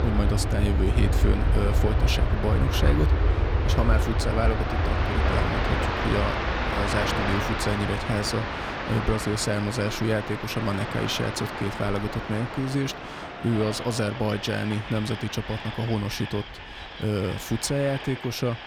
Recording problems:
train or aircraft noise; very loud; throughout; as loud as the speech

